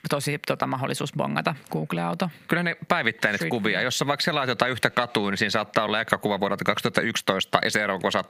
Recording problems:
squashed, flat; heavily

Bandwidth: 15 kHz